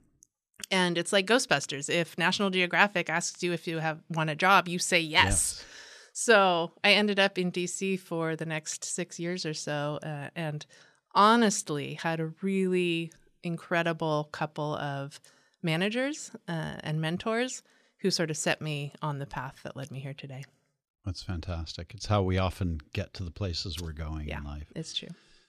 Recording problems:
none

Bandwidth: 13.5 kHz